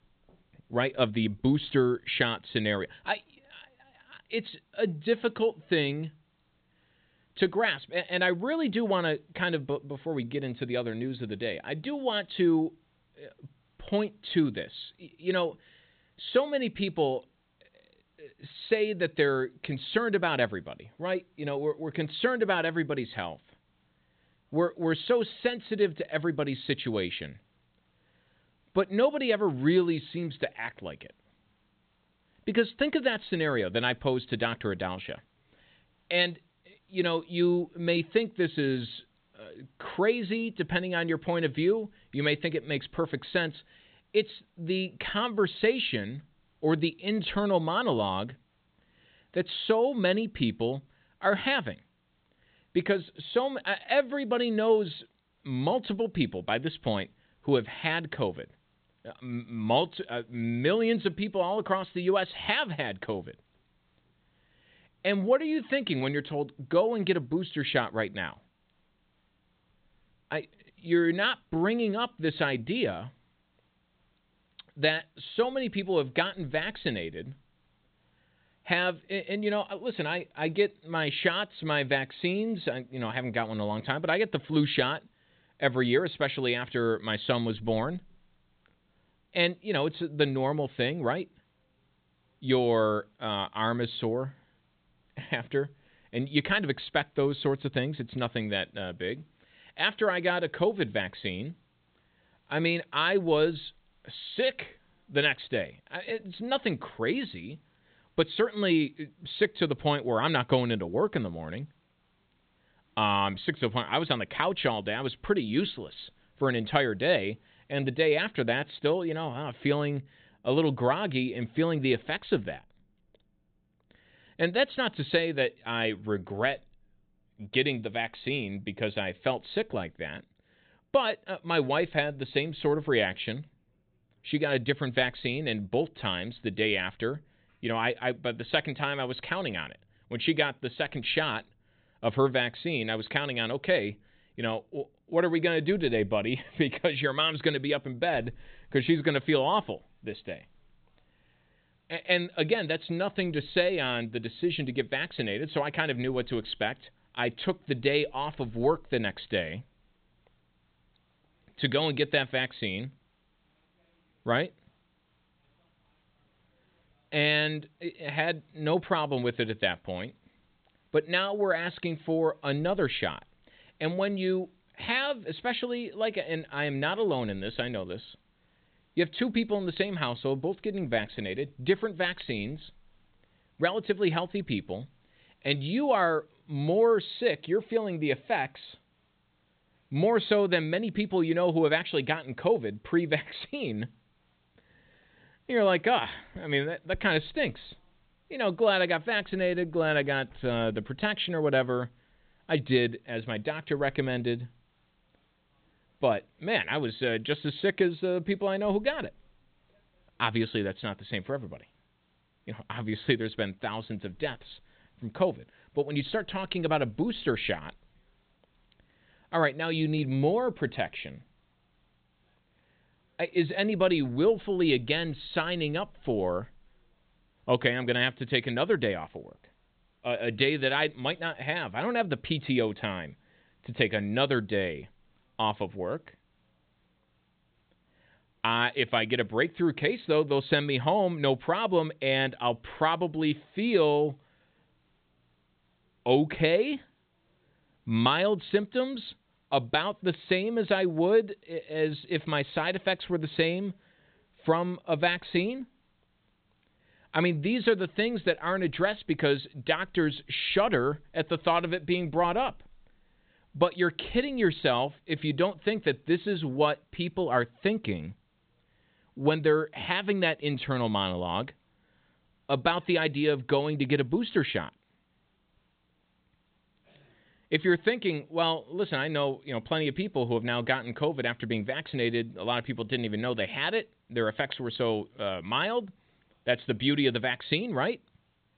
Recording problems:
high frequencies cut off; severe; nothing above 4 kHz
hiss; very faint; until 1:58 and from 2:29 on; 45 dB below the speech

